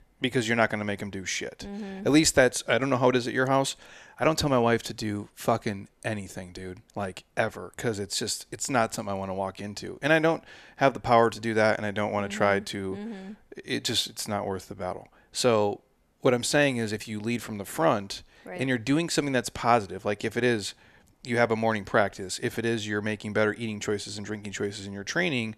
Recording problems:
none

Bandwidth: 14 kHz